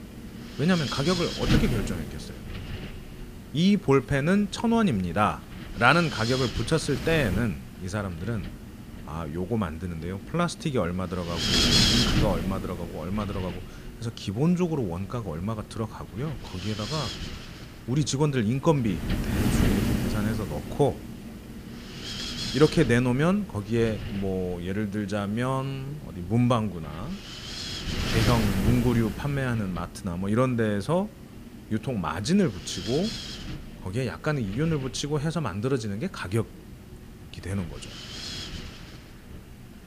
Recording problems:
wind noise on the microphone; heavy; 2 dB below the speech

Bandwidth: 15 kHz